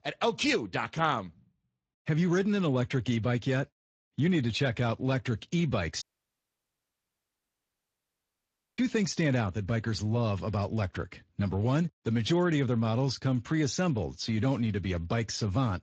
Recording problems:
garbled, watery; slightly
audio cutting out; at 6 s for 3 s

